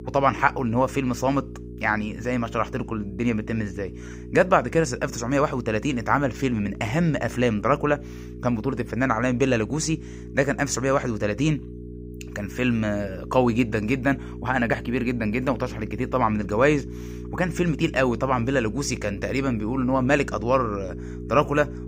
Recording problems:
electrical hum; noticeable; throughout; 60 Hz, 20 dB below the speech

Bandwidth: 15.5 kHz